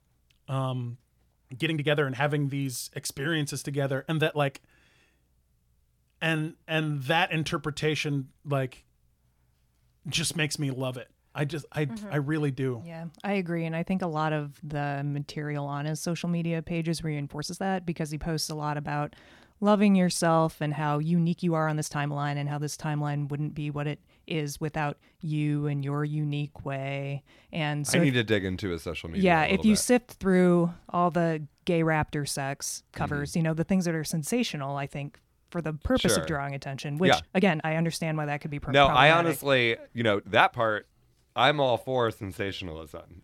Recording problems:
uneven, jittery; strongly; from 1 to 43 s

